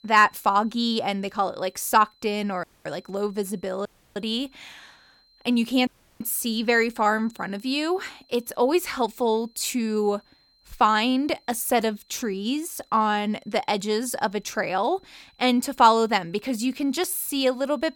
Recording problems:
high-pitched whine; faint; throughout; 4 kHz, 35 dB below the speech
audio cutting out; at 2.5 s, at 4 s and at 6 s

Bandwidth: 18 kHz